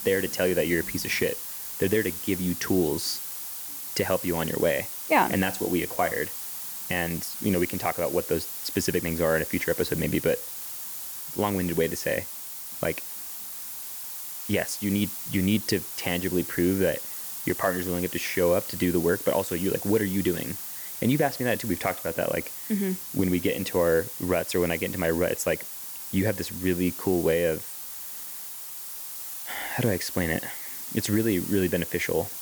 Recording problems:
hiss; loud; throughout; 6 dB below the speech

